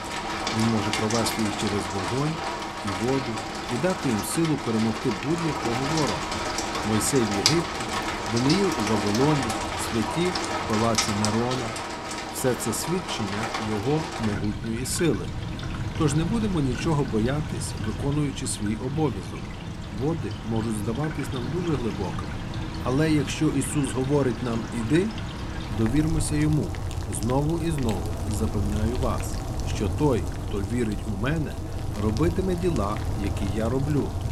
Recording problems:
rain or running water; loud; throughout; 3 dB below the speech

